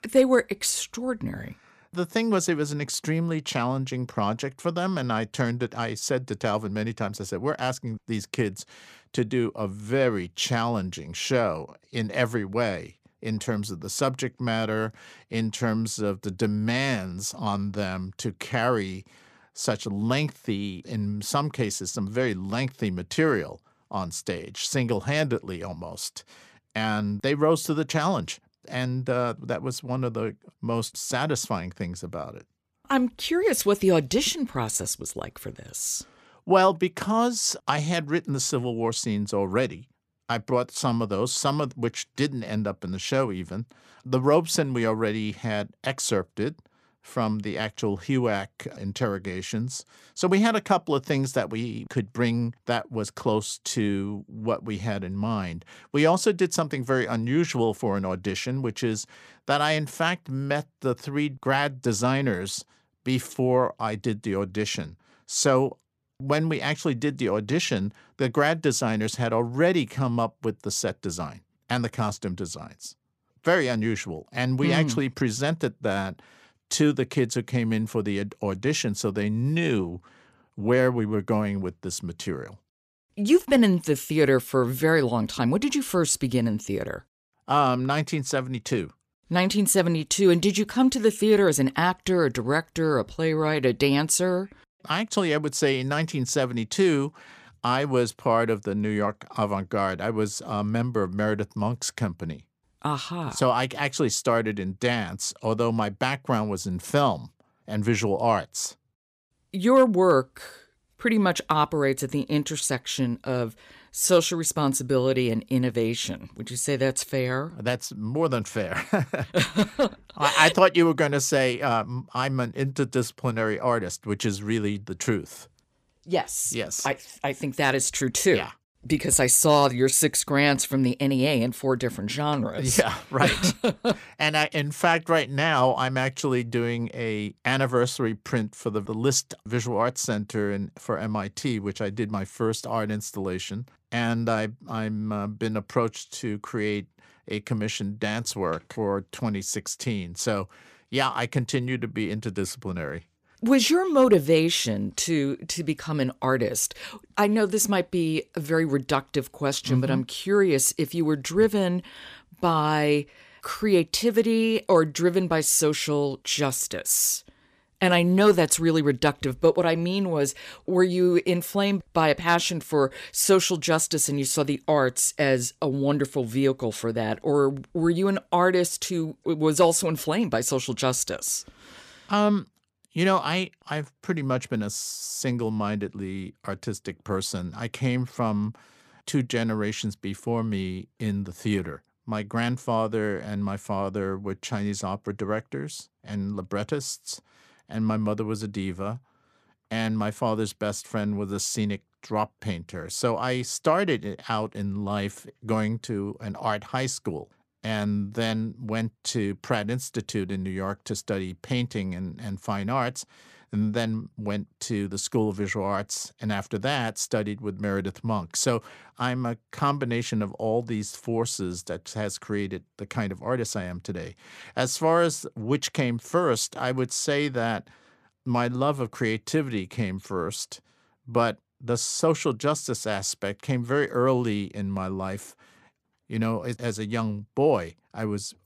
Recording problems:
none

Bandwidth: 14.5 kHz